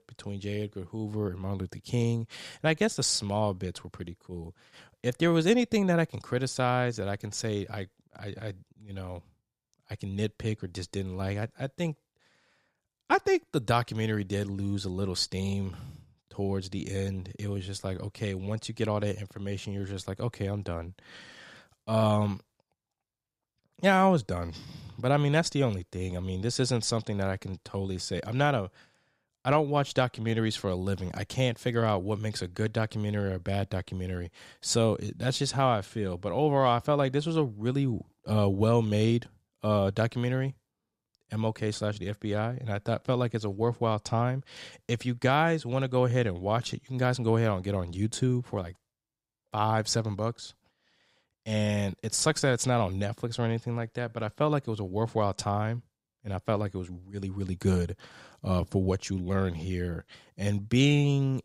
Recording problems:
none

